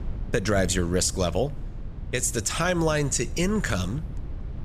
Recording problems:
low rumble; faint; throughout; 20 dB below the speech

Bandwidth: 14.5 kHz